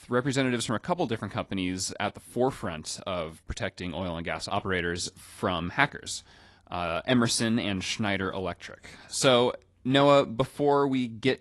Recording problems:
garbled, watery; slightly; nothing above 11 kHz

